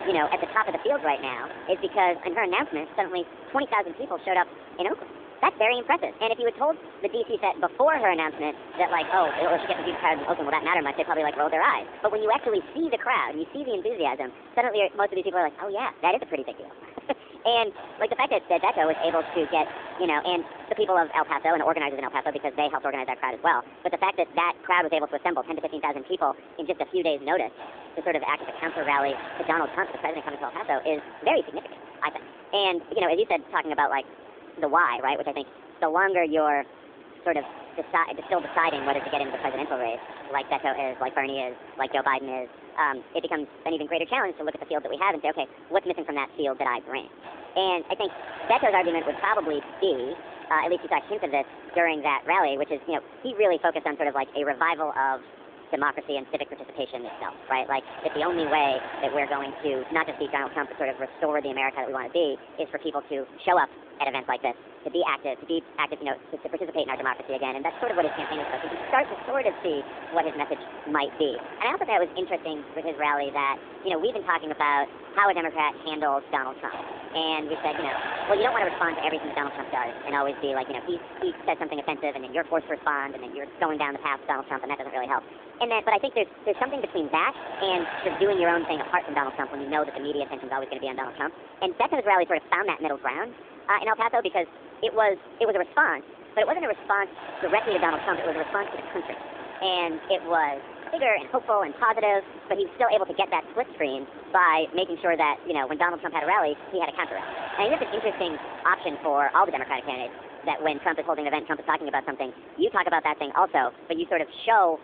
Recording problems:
wrong speed and pitch; too fast and too high; 1.5 times normal speed
phone-call audio
hiss; noticeable; throughout; 15 dB below the speech

